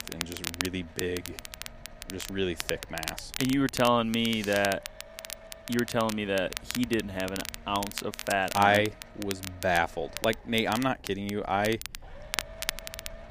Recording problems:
crackle, like an old record; loud; 9 dB below the speech
low rumble; faint; throughout; 20 dB below the speech

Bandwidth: 15 kHz